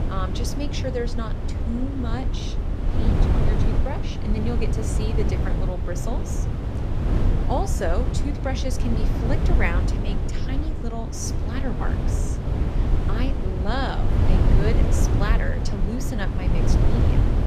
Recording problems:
wind noise on the microphone; heavy; 2 dB below the speech

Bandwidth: 14.5 kHz